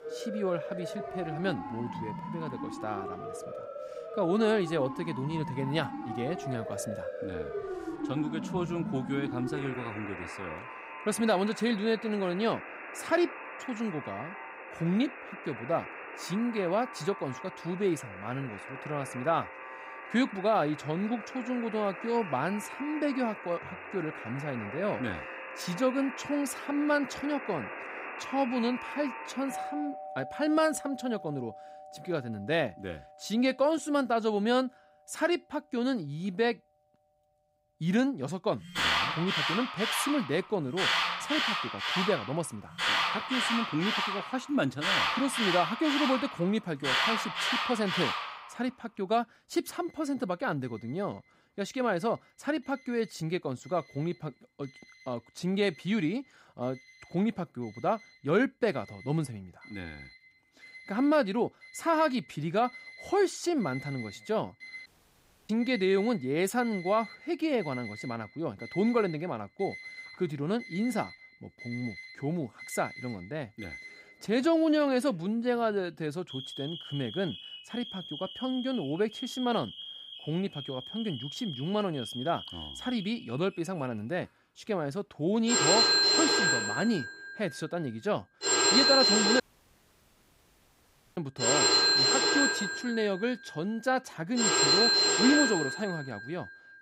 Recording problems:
alarms or sirens; very loud; throughout; as loud as the speech
audio cutting out; at 1:05 for 0.5 s and at 1:29 for 2 s

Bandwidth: 15.5 kHz